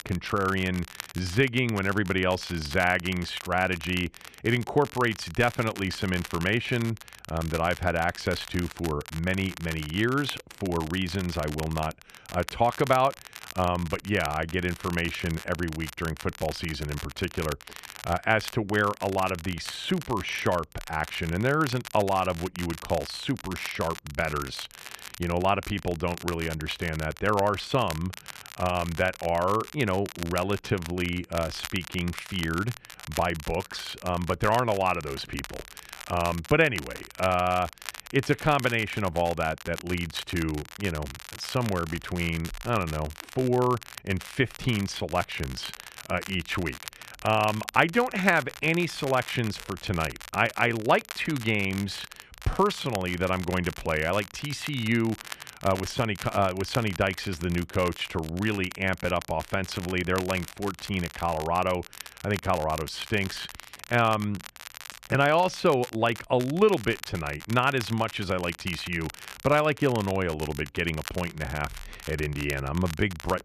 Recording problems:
crackle, like an old record; noticeable; 15 dB below the speech

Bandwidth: 14 kHz